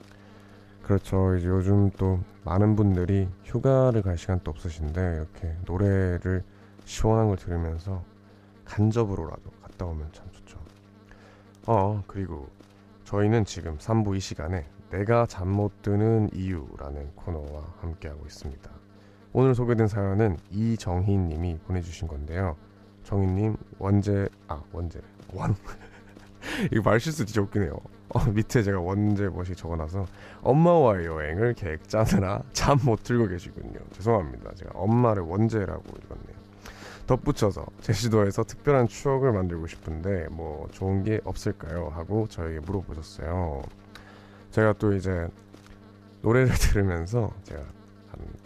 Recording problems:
electrical hum; faint; throughout; 50 Hz, 25 dB below the speech

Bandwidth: 14.5 kHz